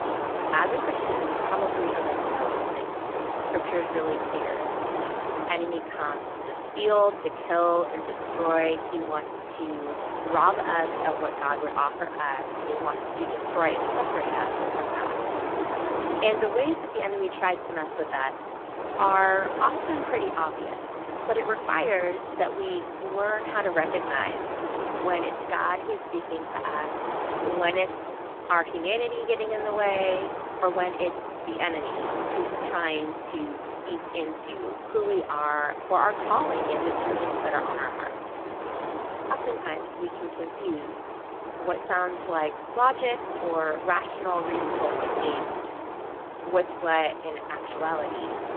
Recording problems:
phone-call audio; poor line
wind noise on the microphone; heavy; 4 dB below the speech

